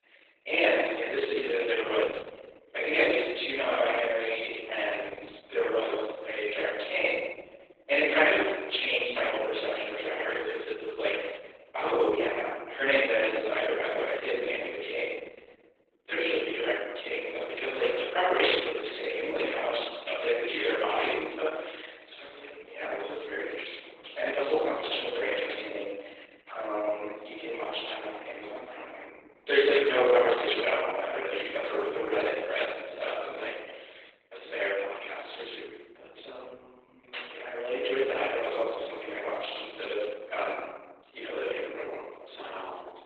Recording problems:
room echo; strong; dies away in 1.3 s
off-mic speech; far
garbled, watery; badly; nothing above 4 kHz
thin; very; fading below 350 Hz

